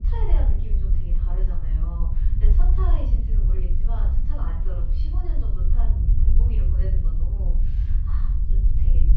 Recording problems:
off-mic speech; far
room echo; noticeable; dies away in 0.4 s
muffled; slightly; fading above 3.5 kHz
low rumble; loud; throughout; 2 dB below the speech
jangling keys; very faint; from 3 s on; peak 30 dB below the speech

